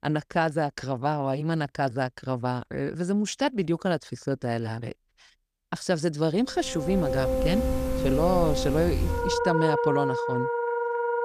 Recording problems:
background music; very loud; from 7 s on; as loud as the speech

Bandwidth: 14.5 kHz